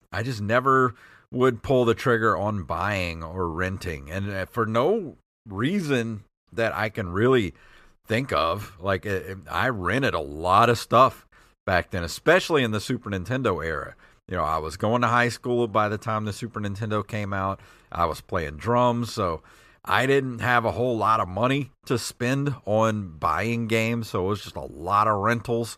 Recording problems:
none

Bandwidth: 14.5 kHz